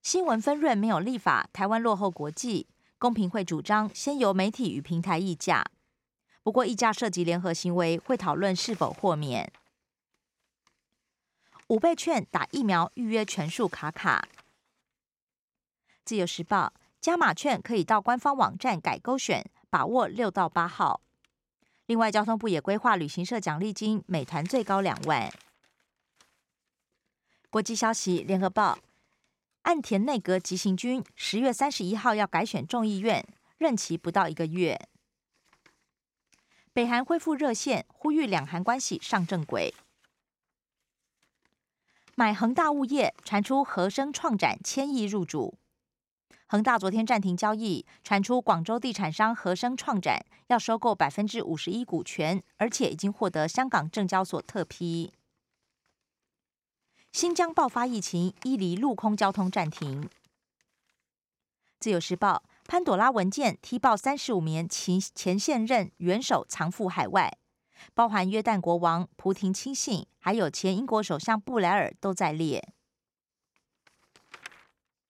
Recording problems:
none

